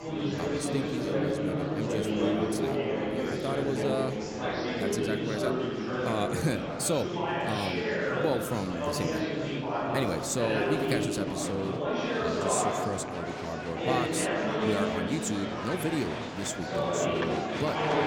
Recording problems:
murmuring crowd; very loud; throughout; 3 dB above the speech

